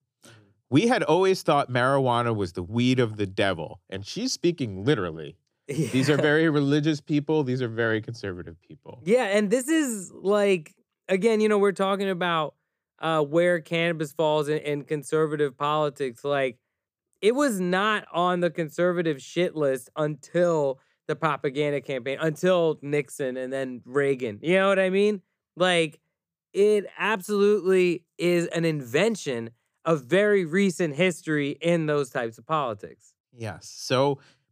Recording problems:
none

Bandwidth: 15 kHz